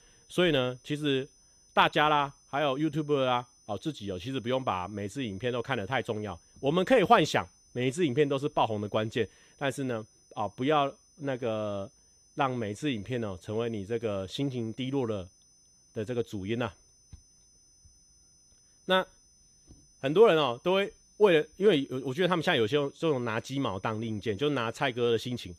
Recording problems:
high-pitched whine; faint; throughout; 6 kHz, 30 dB below the speech

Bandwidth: 14.5 kHz